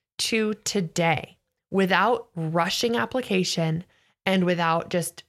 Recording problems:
none

